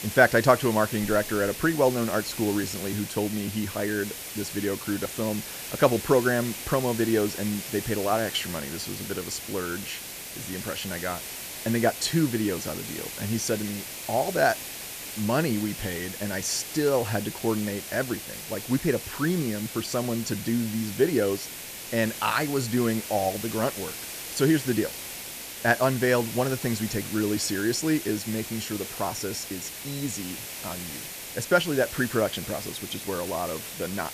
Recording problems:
hiss; loud; throughout; 8 dB below the speech

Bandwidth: 14.5 kHz